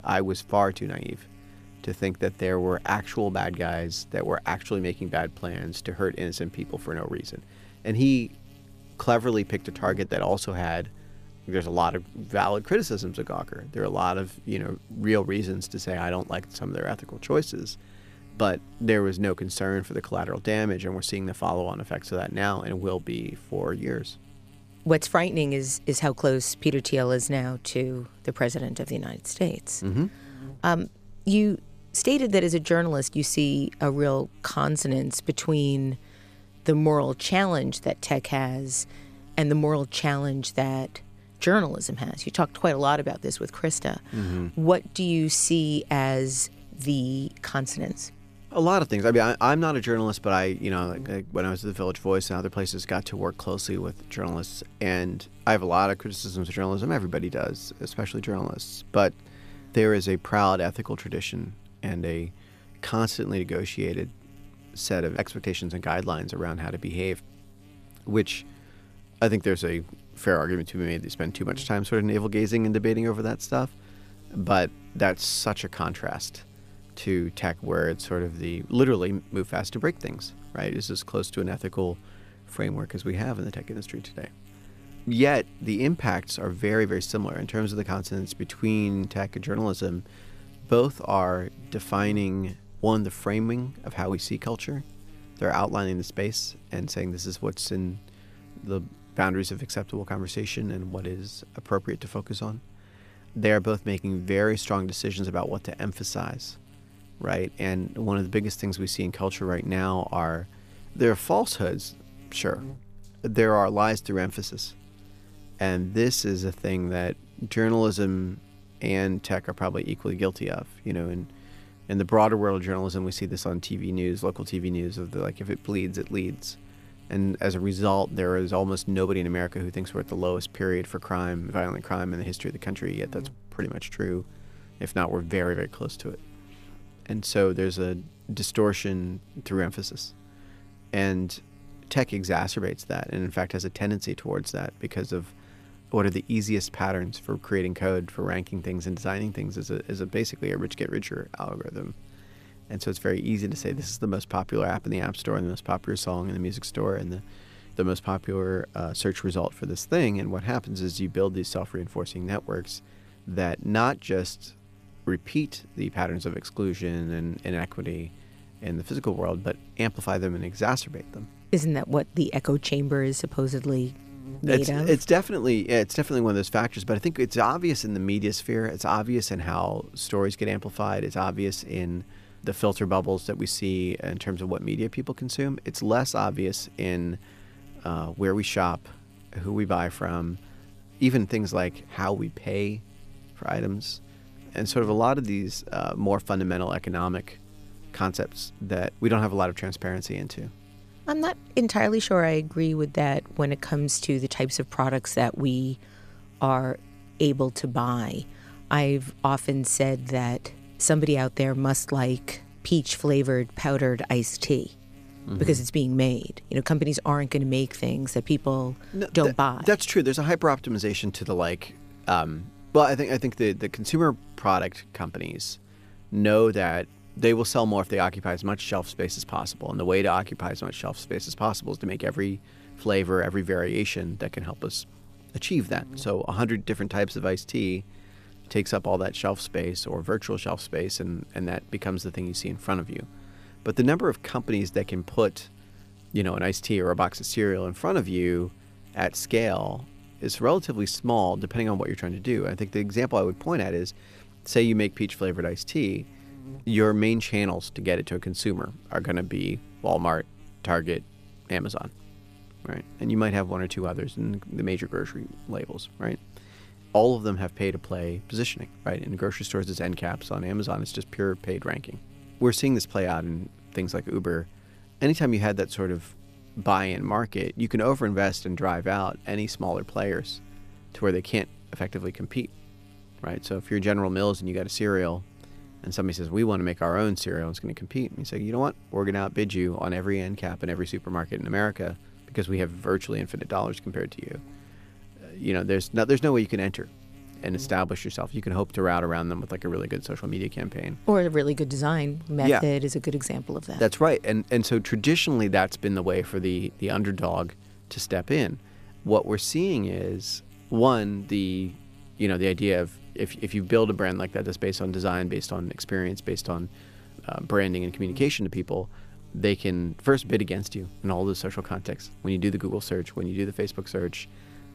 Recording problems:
electrical hum; faint; throughout; 50 Hz, 30 dB below the speech

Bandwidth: 14.5 kHz